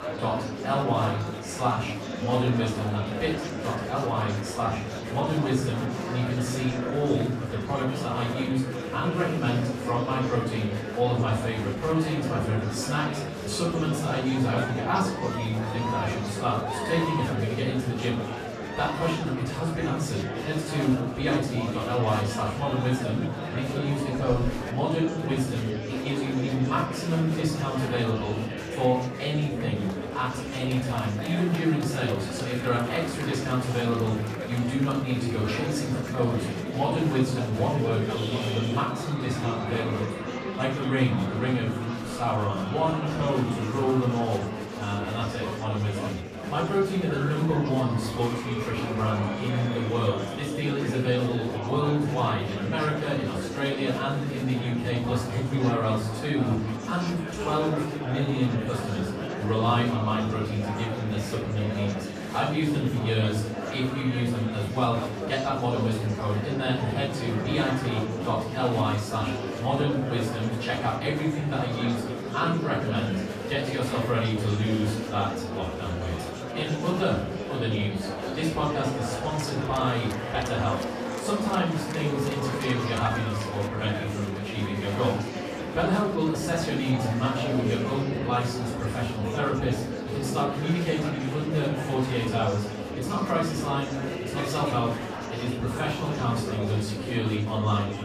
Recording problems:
off-mic speech; far
room echo; noticeable; dies away in 0.5 s
murmuring crowd; loud; throughout; 5 dB below the speech

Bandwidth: 14.5 kHz